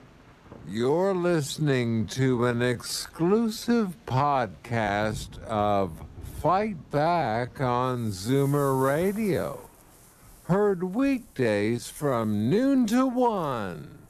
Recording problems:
wrong speed, natural pitch; too slow; 0.5 times normal speed
rain or running water; faint; throughout; 20 dB below the speech

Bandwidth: 13.5 kHz